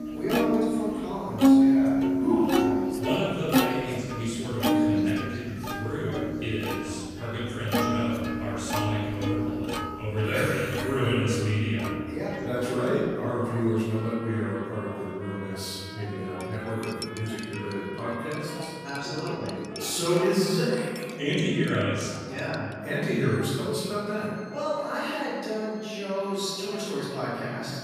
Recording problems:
room echo; strong; dies away in 1.6 s
off-mic speech; far
background music; very loud; throughout; 2 dB above the speech
chatter from many people; noticeable; throughout; 15 dB below the speech
clattering dishes; noticeable; from 16 to 23 s; peak 8 dB below the speech

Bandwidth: 14.5 kHz